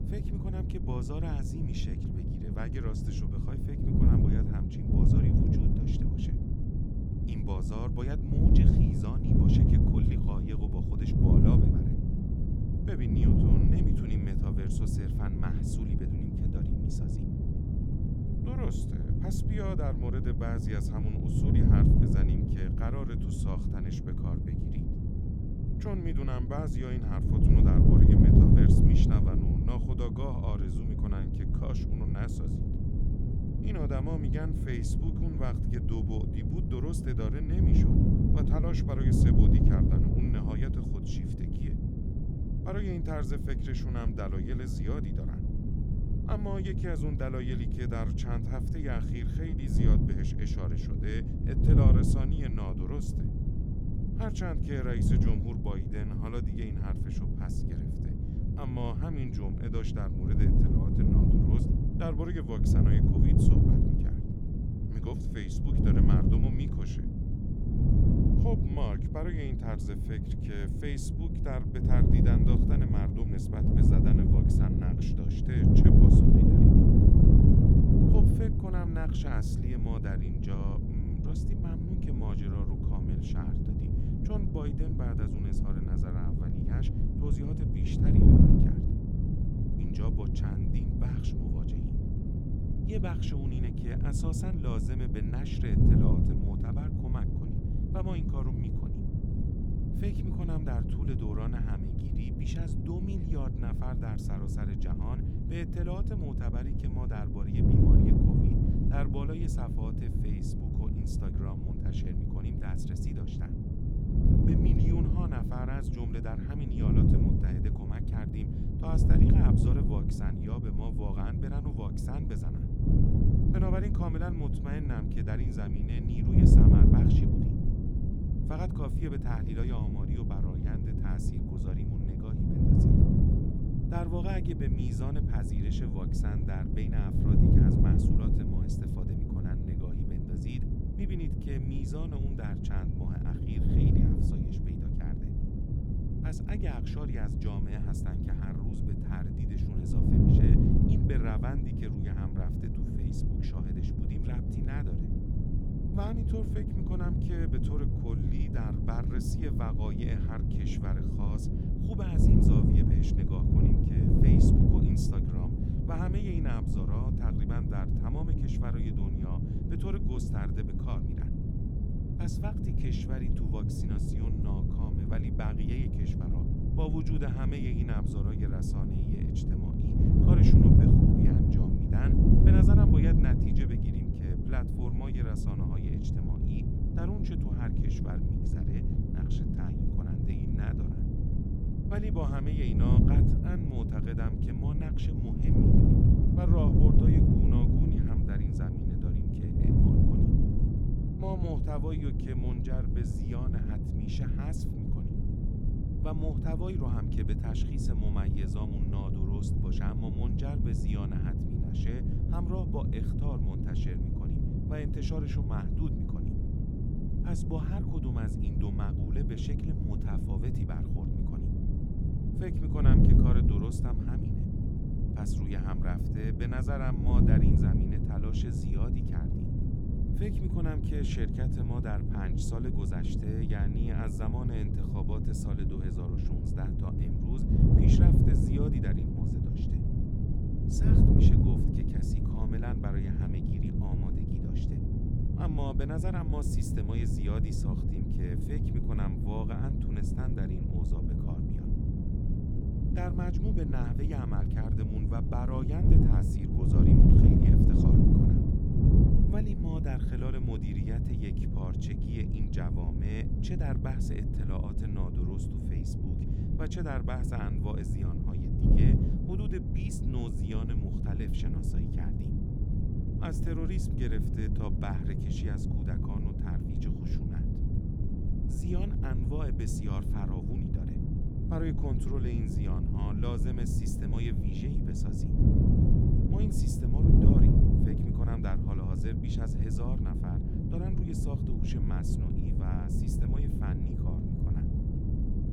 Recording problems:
wind noise on the microphone; heavy; 5 dB above the speech

